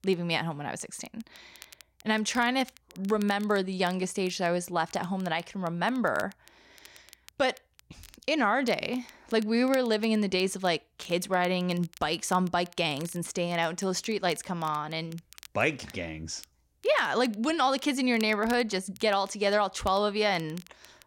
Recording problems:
crackle, like an old record; faint; 25 dB below the speech

